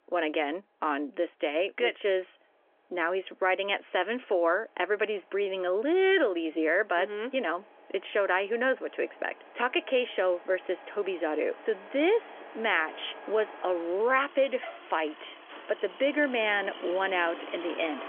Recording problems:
phone-call audio; nothing above 3.5 kHz
traffic noise; noticeable; throughout; 15 dB below the speech

